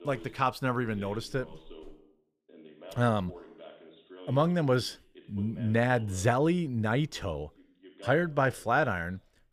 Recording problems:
voice in the background; faint; throughout; 20 dB below the speech

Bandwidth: 15 kHz